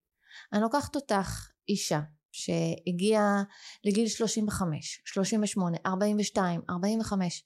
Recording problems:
none

